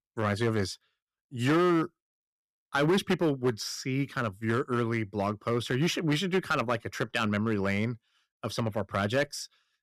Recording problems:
distortion; slight; 5% of the sound clipped

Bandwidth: 14.5 kHz